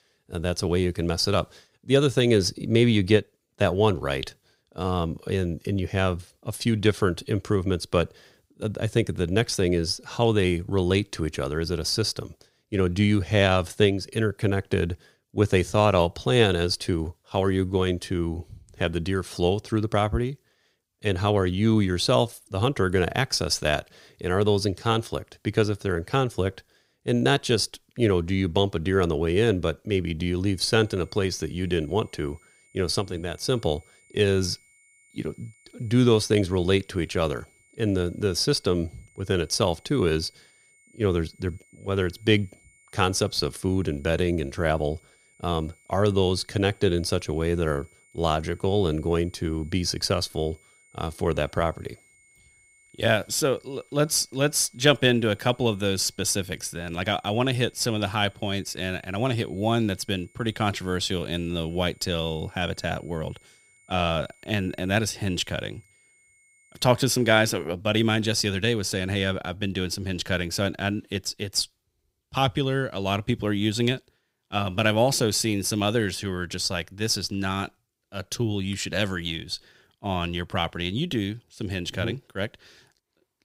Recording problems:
high-pitched whine; faint; from 31 s to 1:08; 2 kHz, 30 dB below the speech

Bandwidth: 15.5 kHz